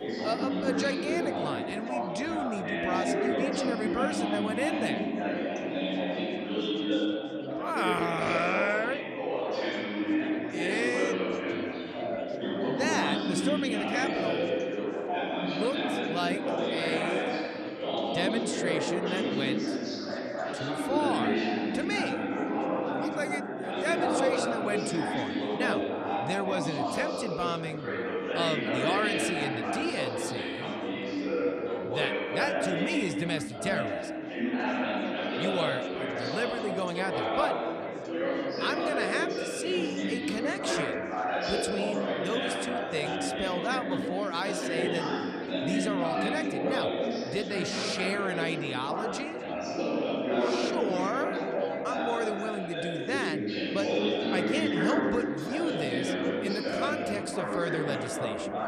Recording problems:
chatter from many people; very loud; throughout; 3 dB above the speech

